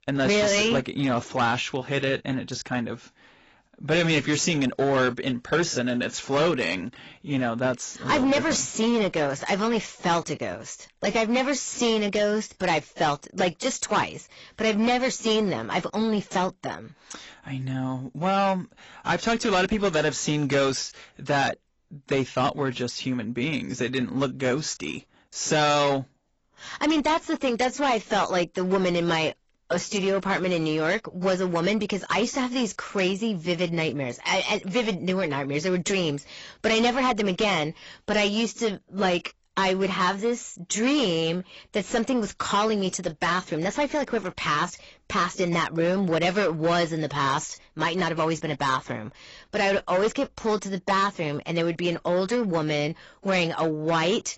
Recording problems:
garbled, watery; badly; nothing above 7.5 kHz
distortion; slight; 9% of the sound clipped

